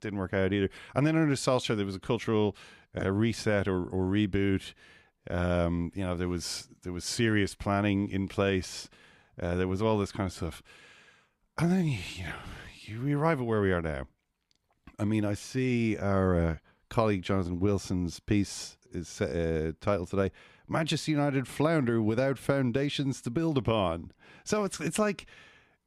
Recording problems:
none

